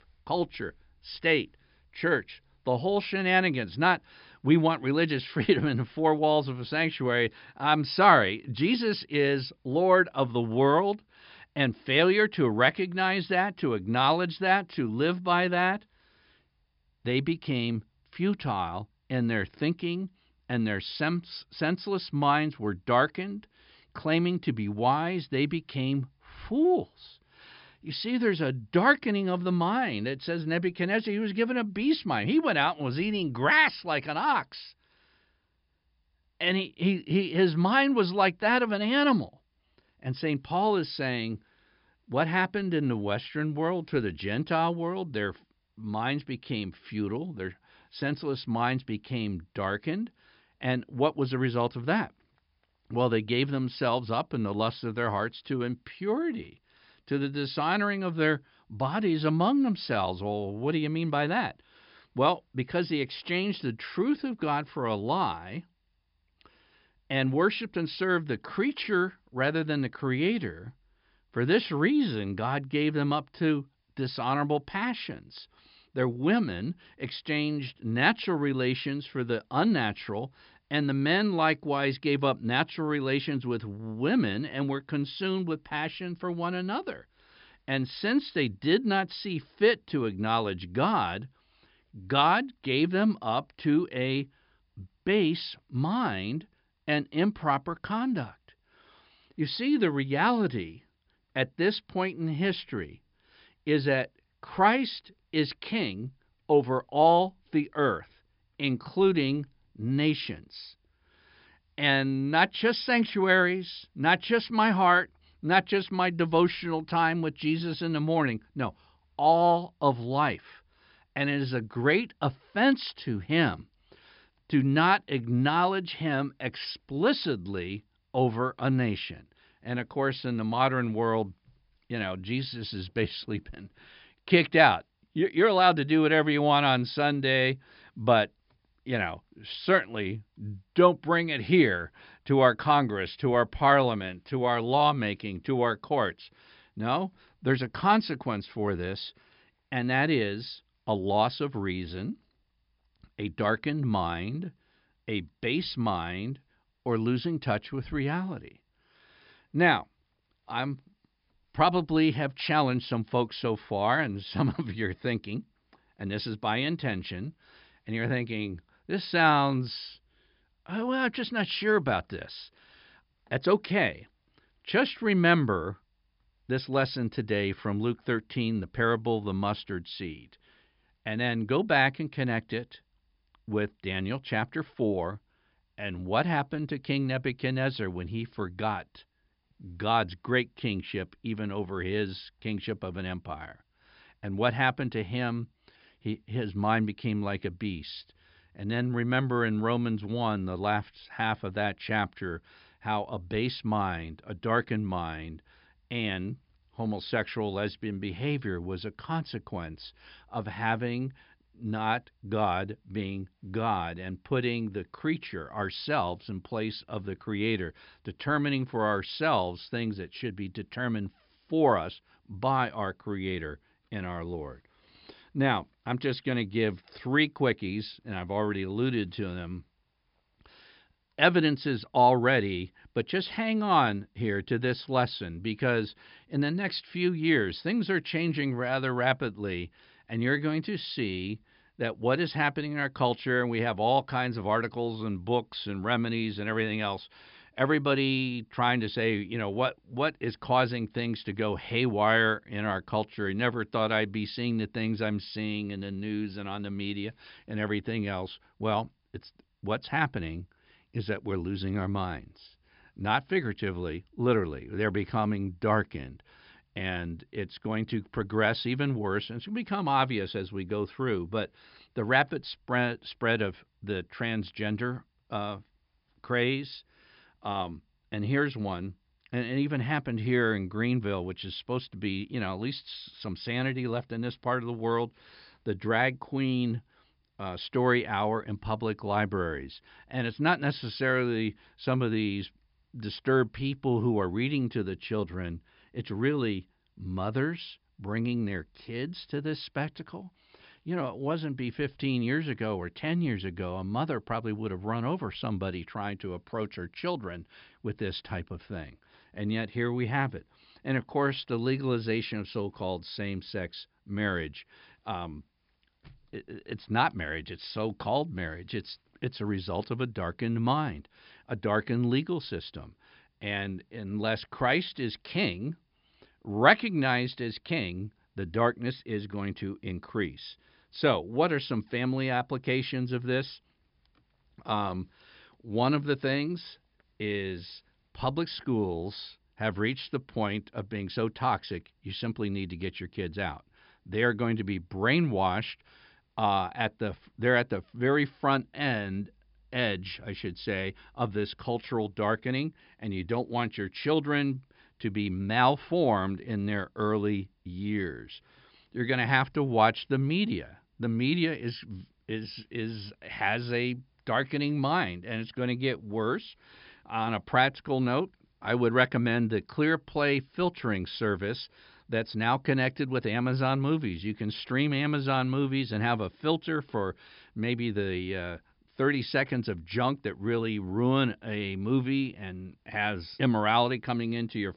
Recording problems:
high frequencies cut off; noticeable; nothing above 5.5 kHz

